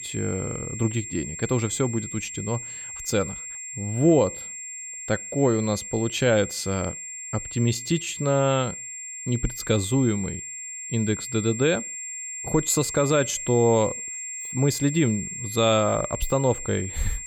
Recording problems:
high-pitched whine; loud; throughout; 7.5 kHz, 8 dB below the speech

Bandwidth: 17 kHz